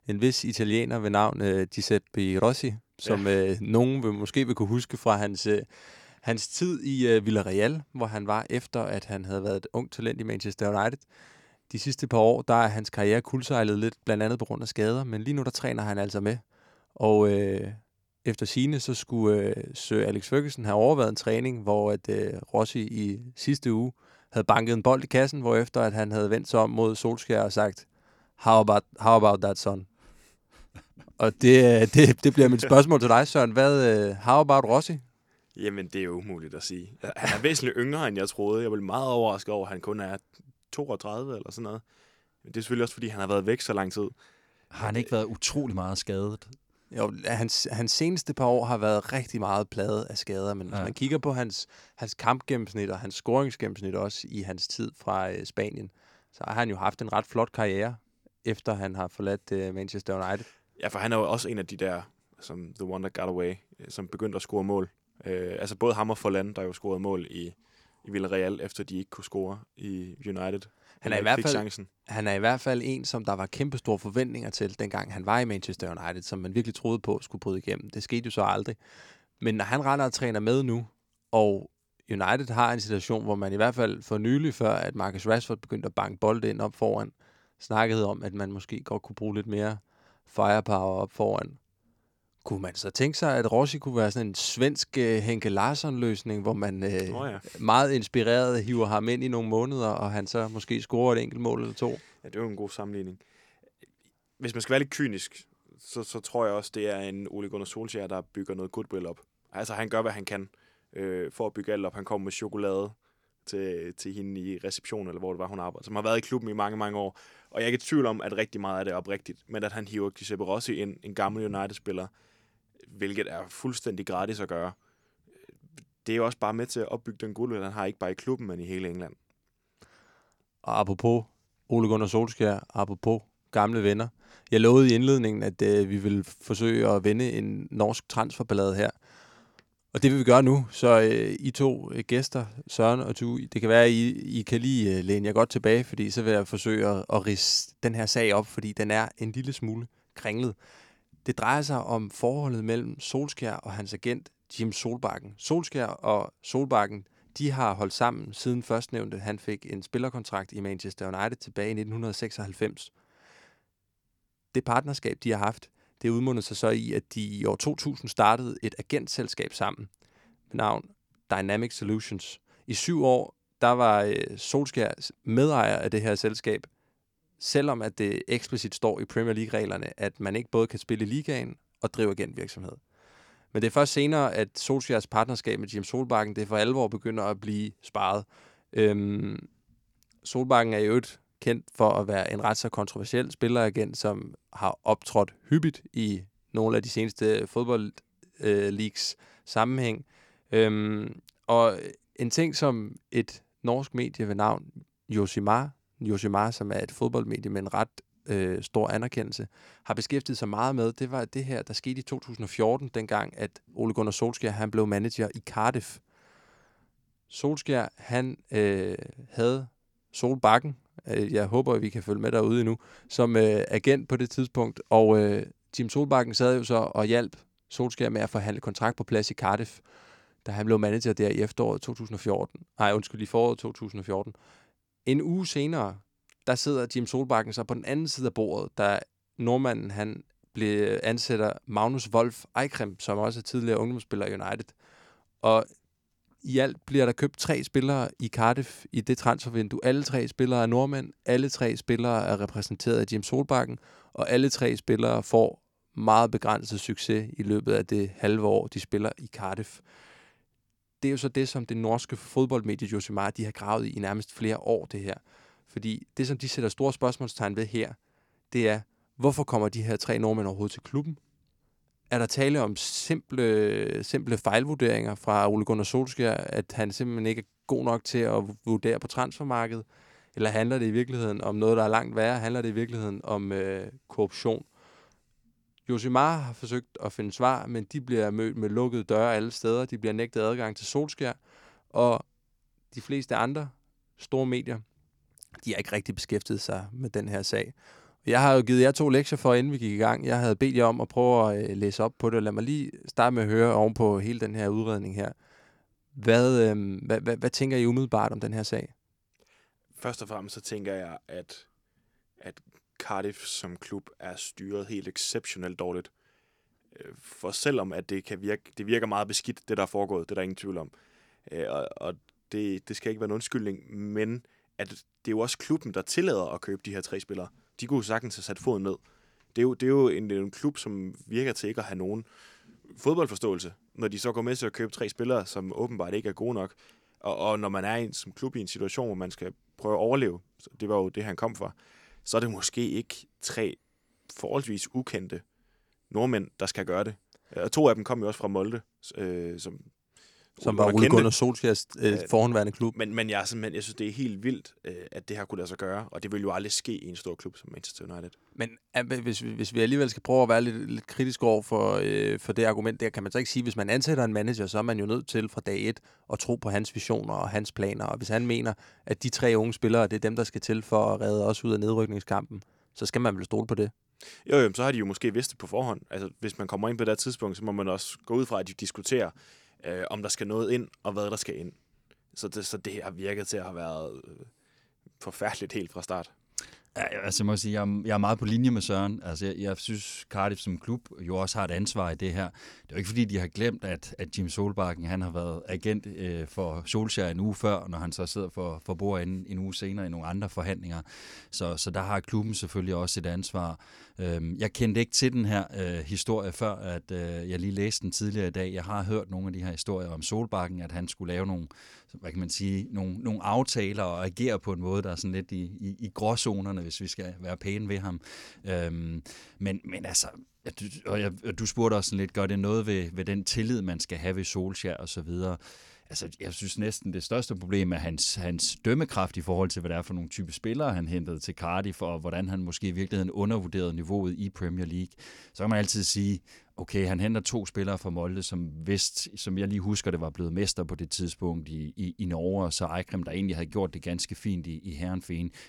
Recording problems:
none

